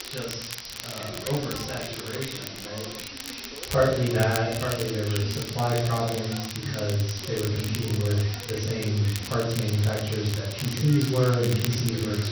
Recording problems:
off-mic speech; far
room echo; noticeable; dies away in 0.6 s
high frequencies cut off; noticeable; nothing above 6 kHz
voice in the background; noticeable; throughout; 15 dB below the speech
hiss; noticeable; throughout; 10 dB below the speech
crackle, like an old record; noticeable; 10 dB below the speech

